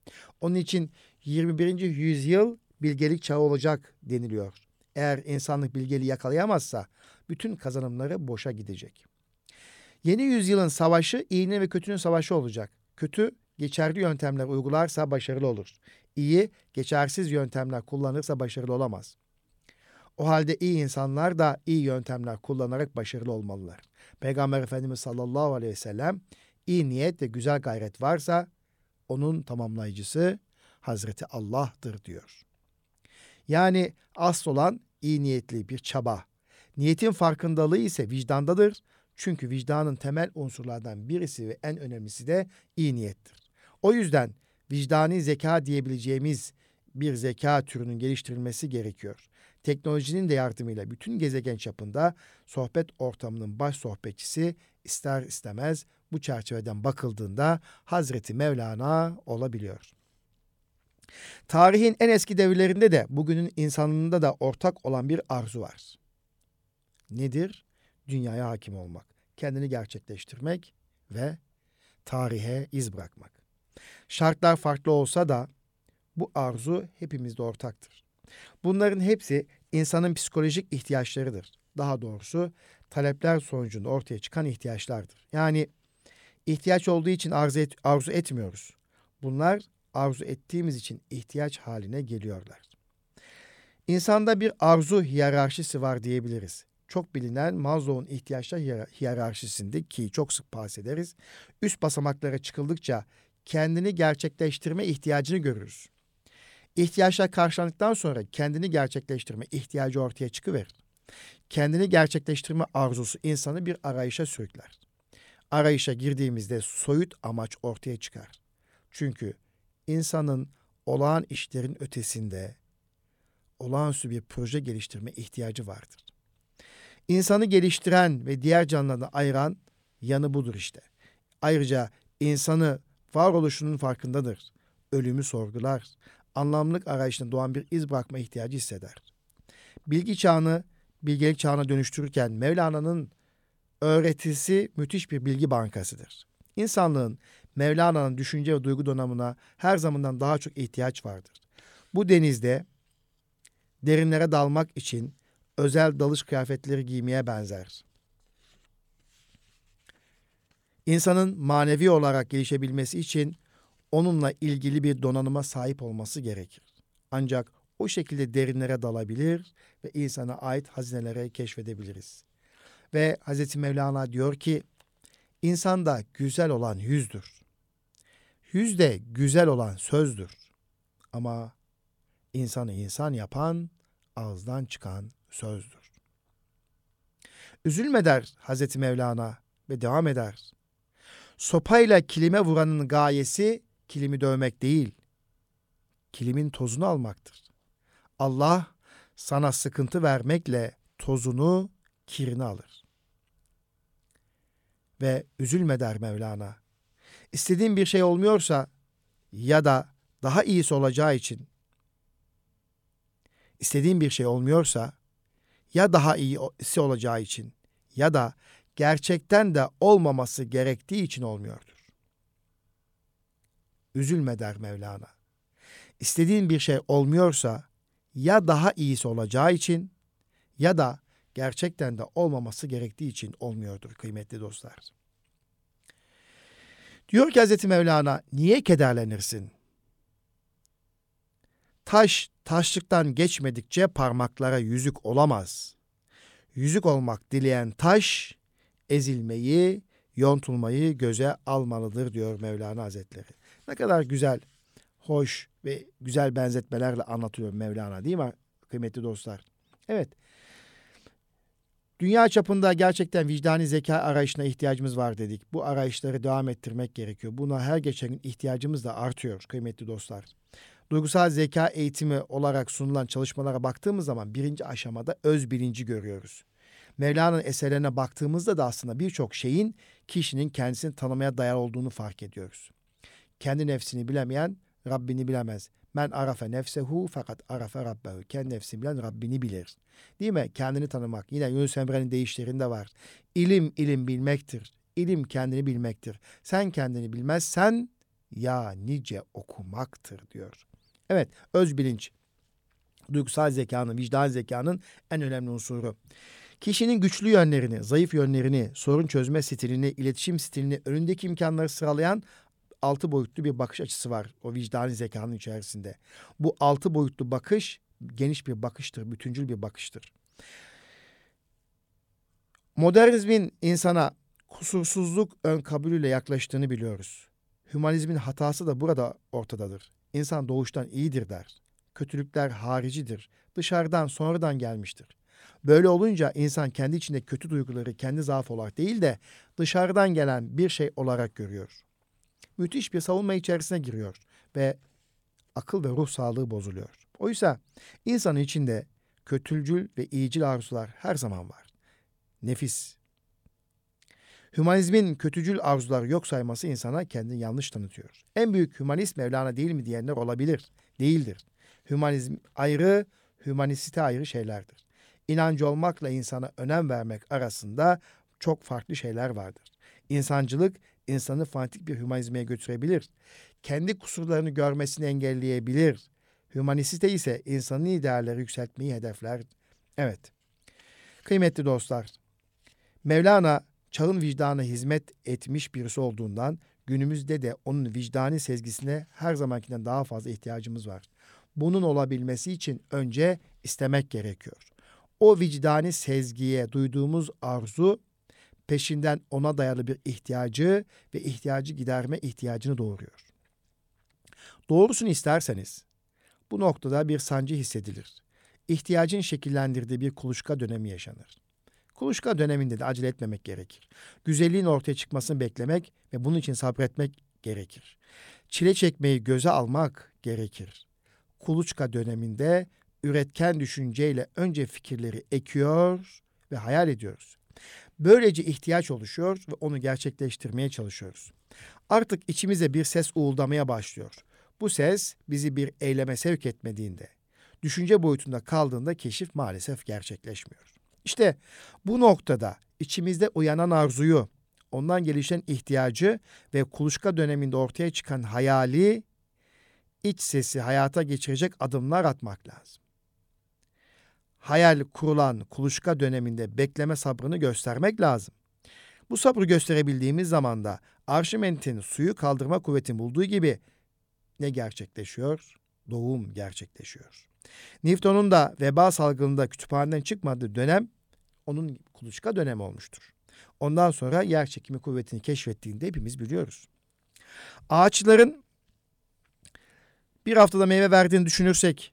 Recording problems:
none

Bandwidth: 17 kHz